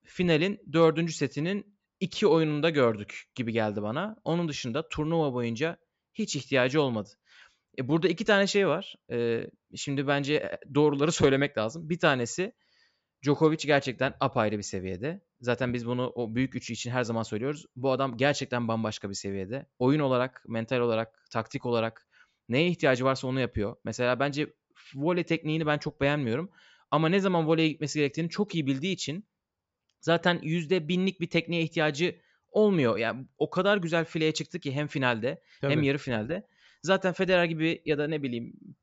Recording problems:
high frequencies cut off; noticeable; nothing above 8 kHz

